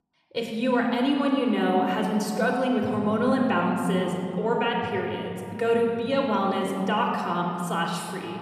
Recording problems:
room echo; noticeable; dies away in 2.7 s
off-mic speech; somewhat distant

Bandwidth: 14 kHz